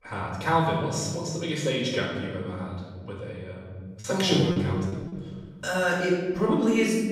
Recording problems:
off-mic speech; far
room echo; noticeable; dies away in 1.8 s
choppy; very; at 4 s; 9% of the speech affected

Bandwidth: 15.5 kHz